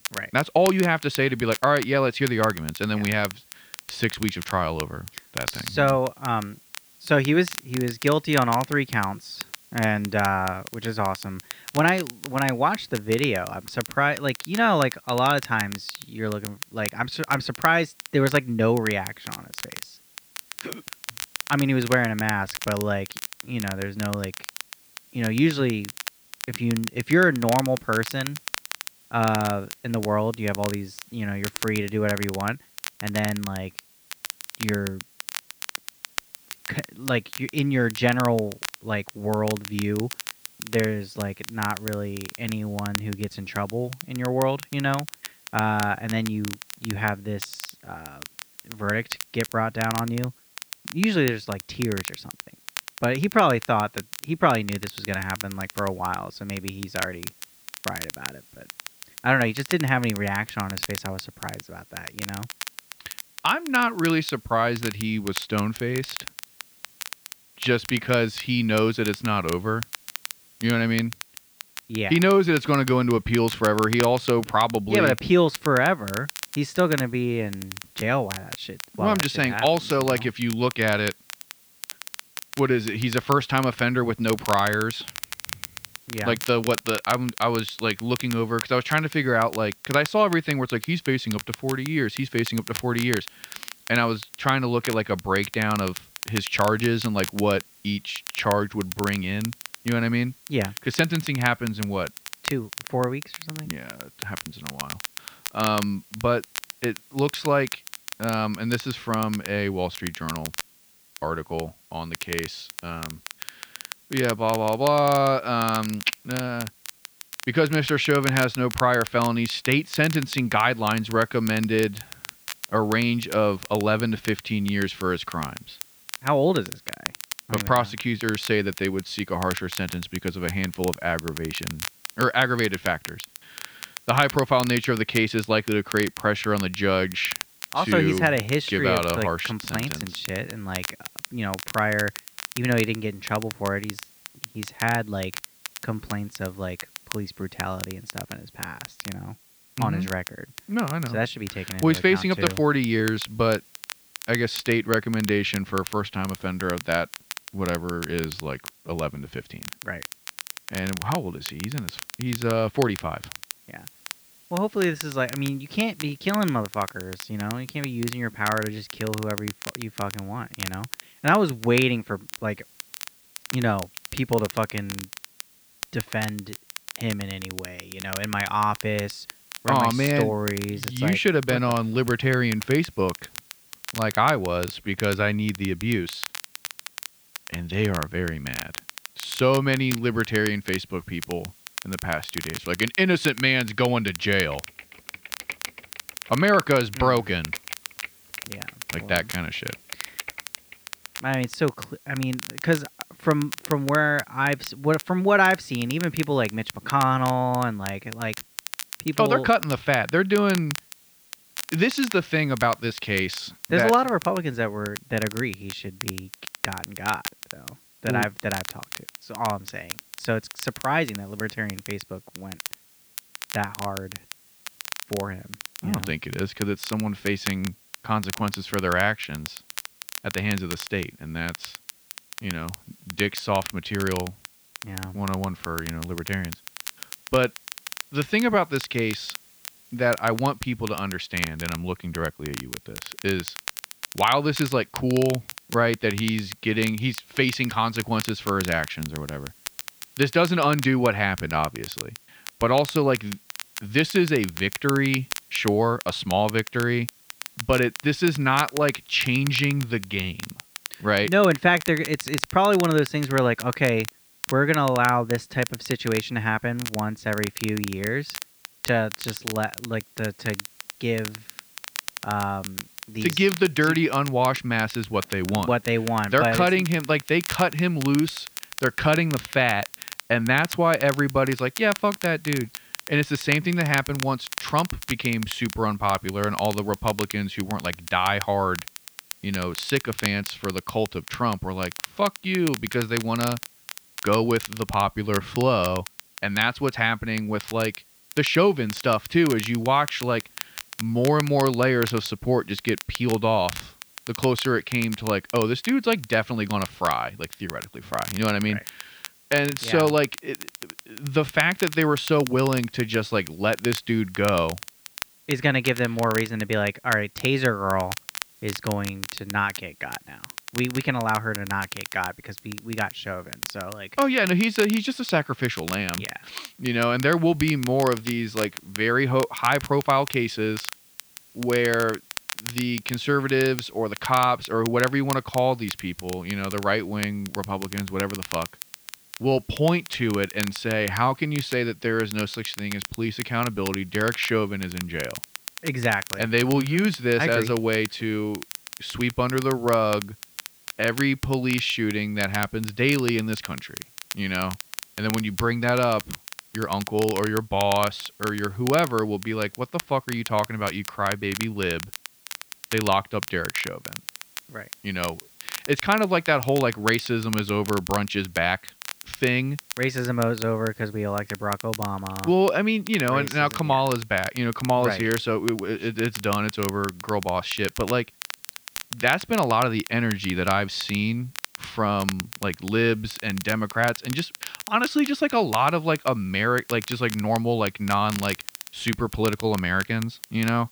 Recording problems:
muffled; slightly; fading above 2.5 kHz
crackle, like an old record; noticeable; 10 dB below the speech
hiss; faint; throughout; 30 dB below the speech
keyboard typing; faint; from 3:15 to 3:21; peak 10 dB below the speech

